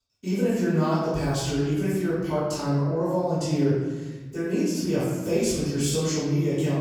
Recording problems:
room echo; strong; dies away in 1.3 s
off-mic speech; far

